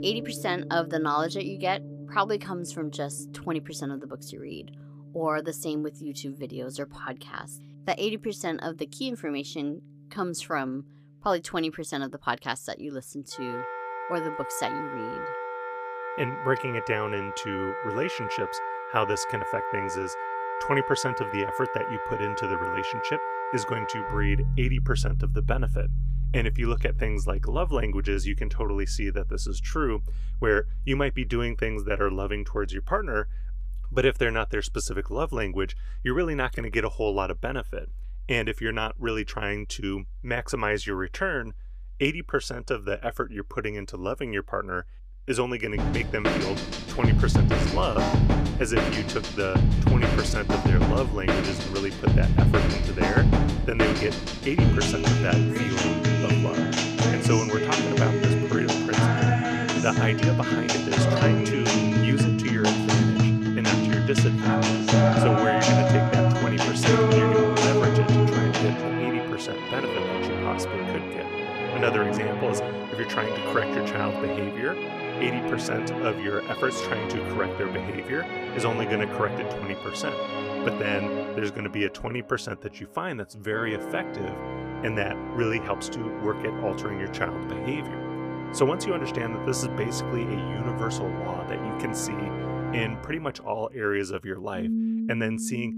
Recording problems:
background music; very loud; throughout; 4 dB above the speech

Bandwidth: 15 kHz